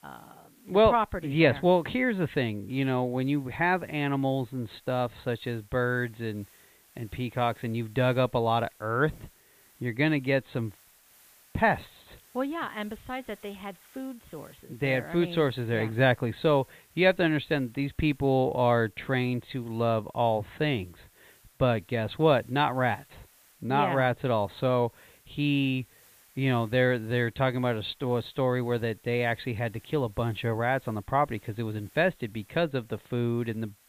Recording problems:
high frequencies cut off; severe; nothing above 4 kHz
hiss; faint; throughout; 30 dB below the speech

